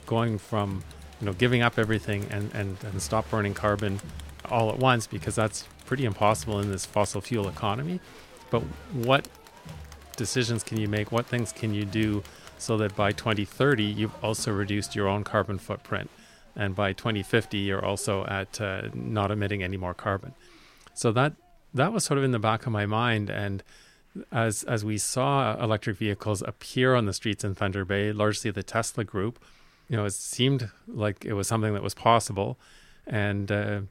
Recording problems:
crowd noise; noticeable; throughout; 20 dB below the speech

